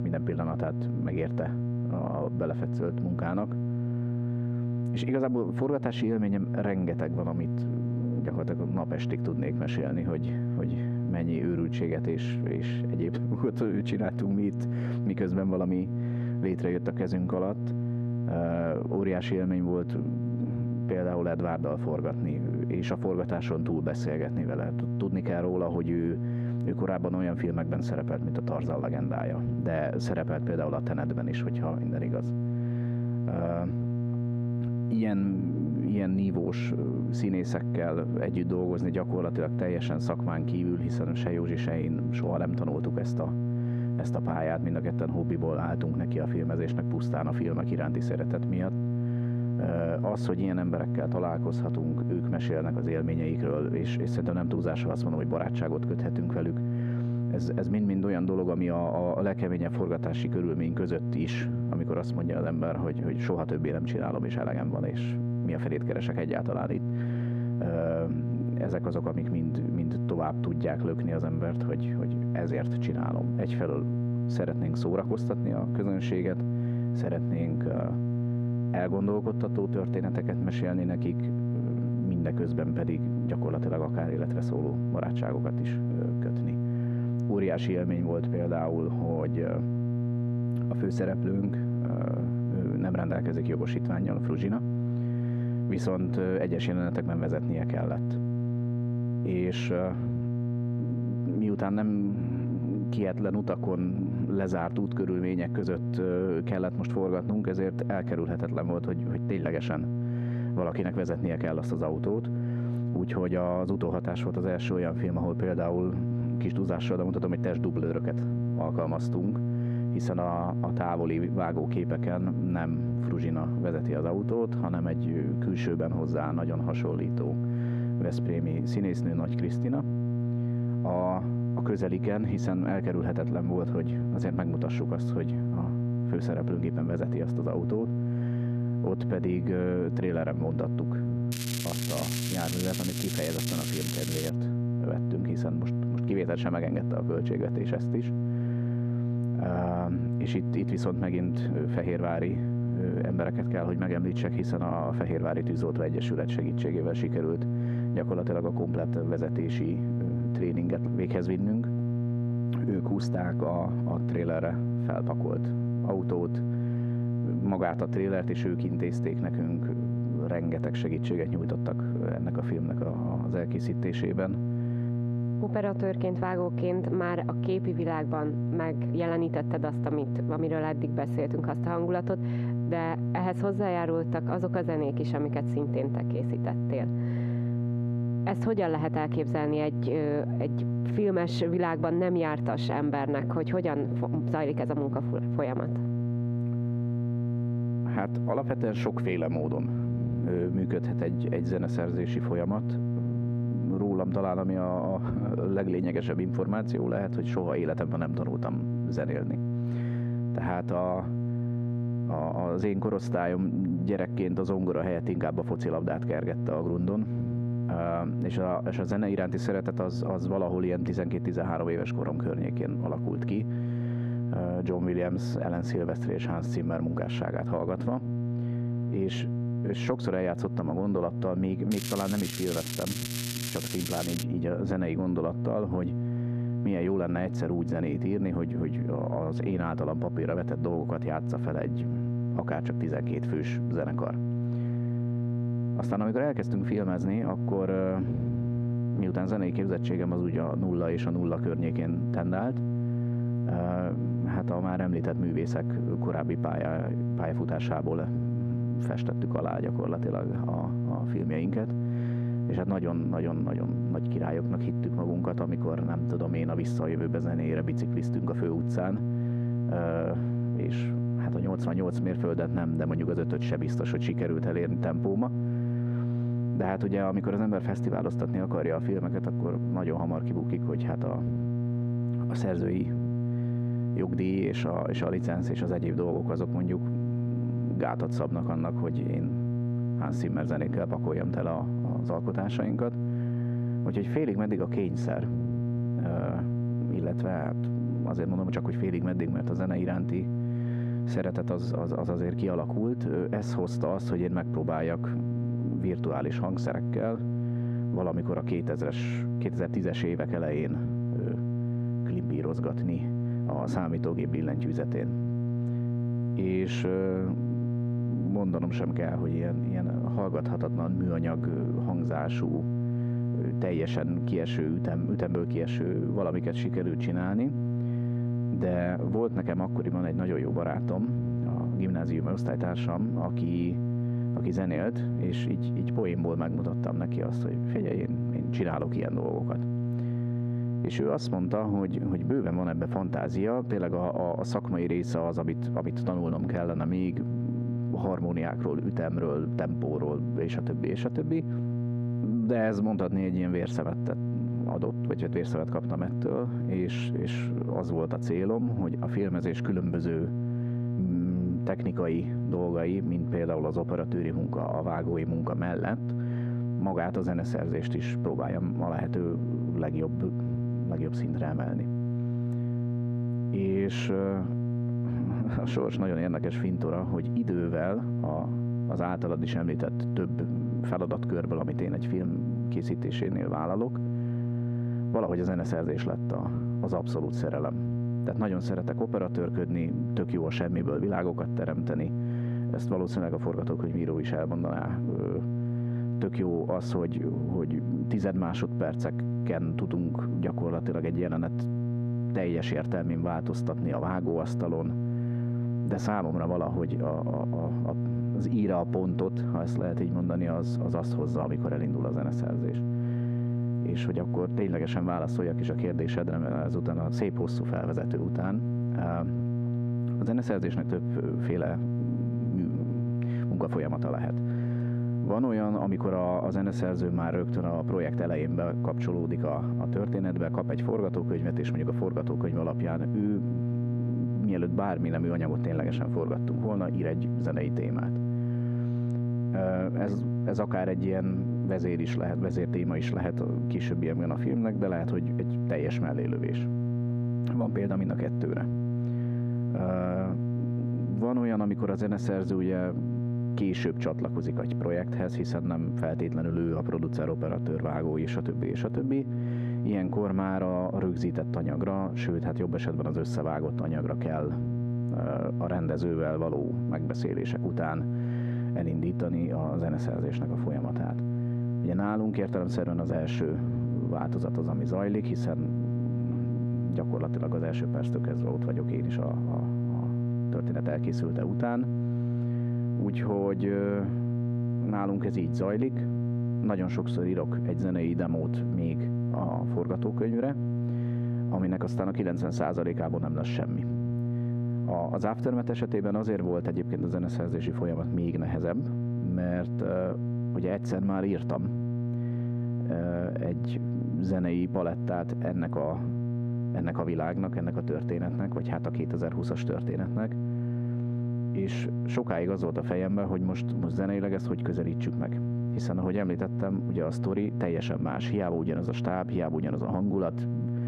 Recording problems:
muffled; very; fading above 2.5 kHz
squashed, flat; somewhat
electrical hum; loud; throughout; 60 Hz, 7 dB below the speech
crackling; loud; from 2:21 to 2:24 and from 3:52 to 3:54; 4 dB below the speech

